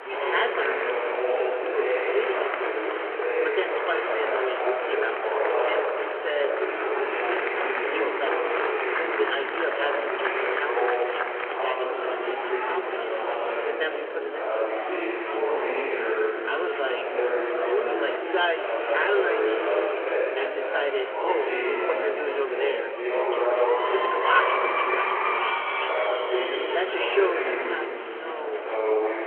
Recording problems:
room echo; slight; dies away in 1.6 s
phone-call audio
off-mic speech; somewhat distant
murmuring crowd; very loud; throughout; 4 dB above the speech

